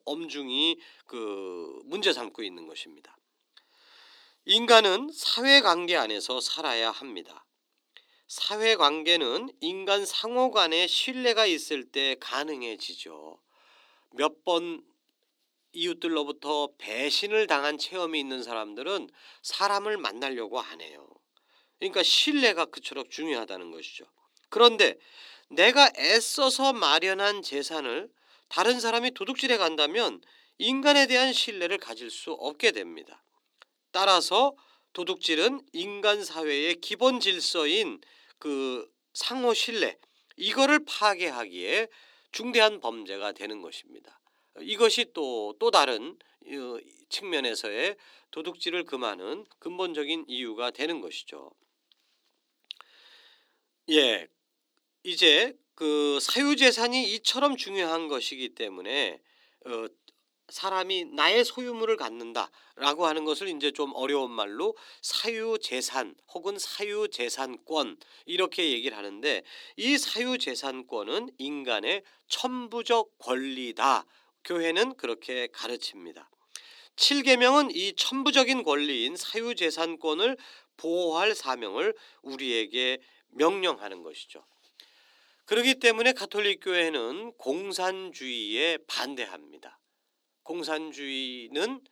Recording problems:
thin; somewhat; fading below 300 Hz

